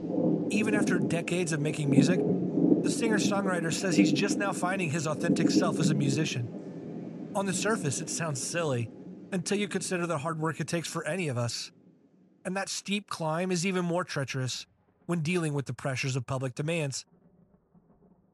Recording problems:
rain or running water; very loud; throughout; 1 dB above the speech

